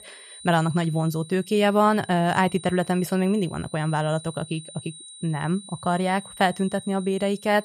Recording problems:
high-pitched whine; noticeable; throughout; 9 kHz, 15 dB below the speech

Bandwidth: 14 kHz